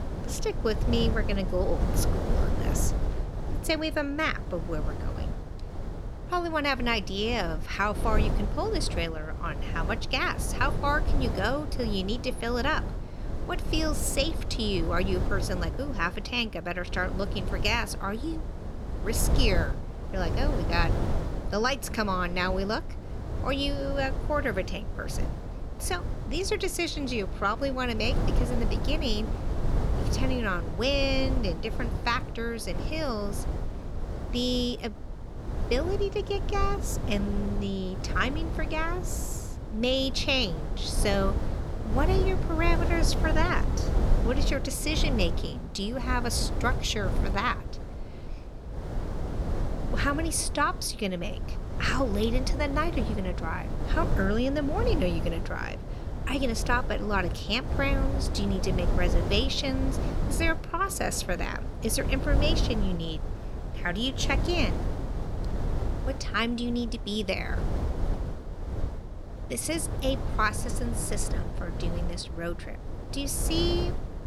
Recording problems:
wind noise on the microphone; heavy; 10 dB below the speech

